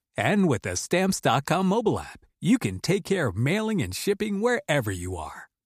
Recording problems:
none

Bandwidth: 15 kHz